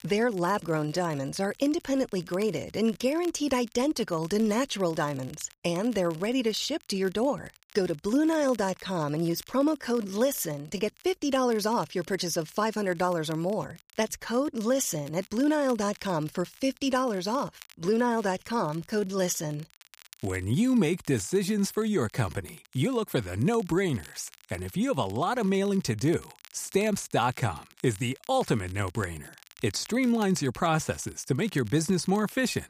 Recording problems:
crackle, like an old record; faint; 25 dB below the speech

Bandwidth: 15 kHz